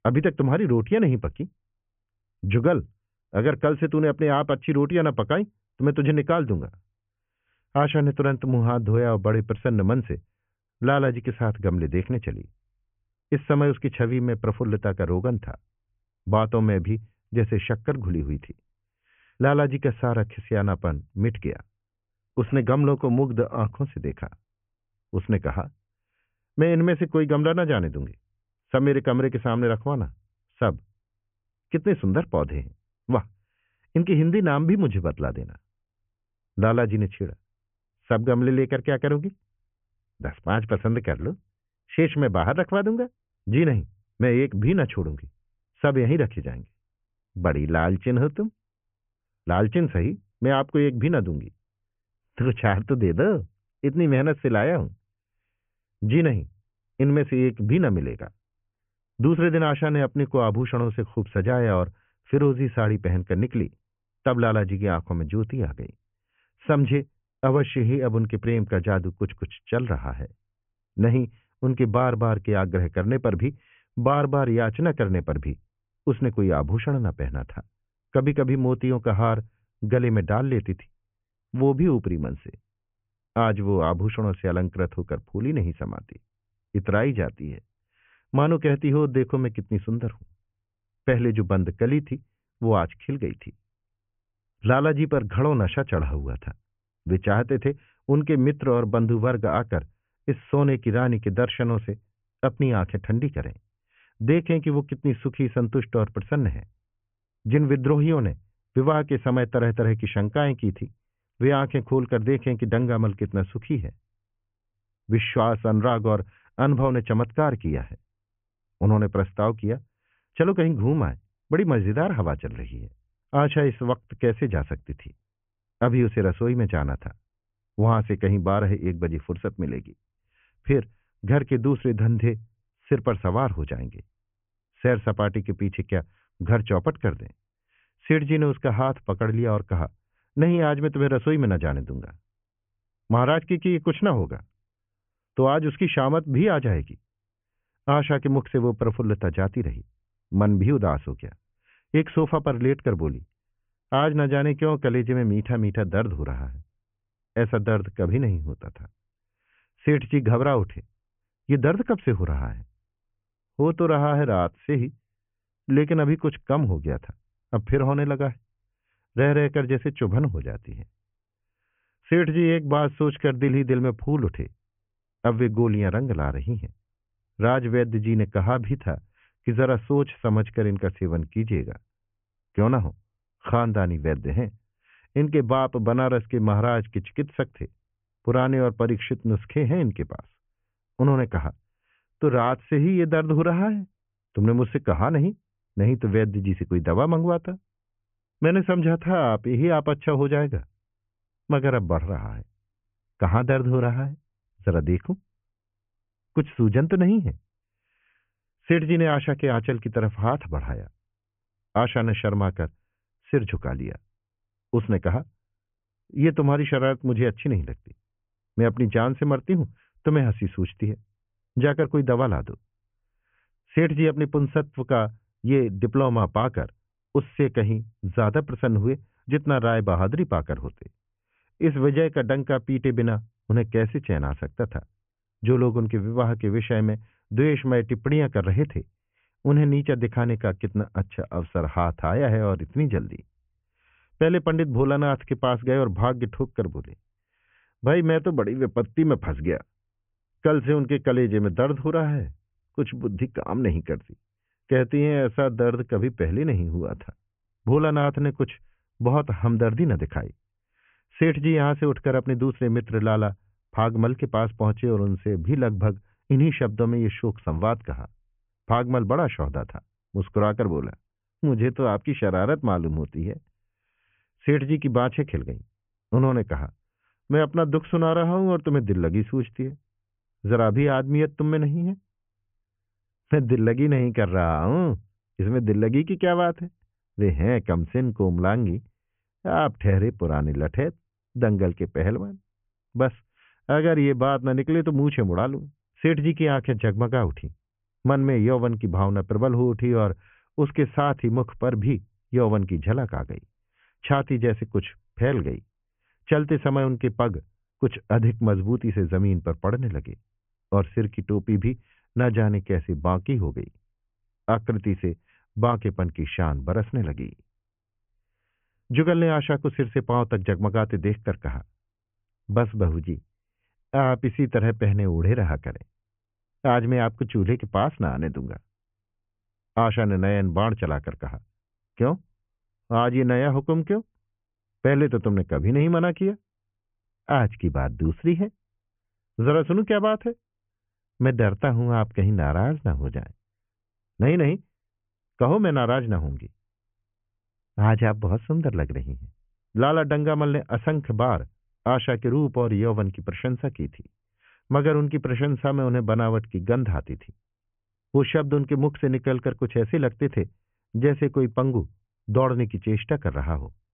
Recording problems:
high frequencies cut off; severe; nothing above 3 kHz

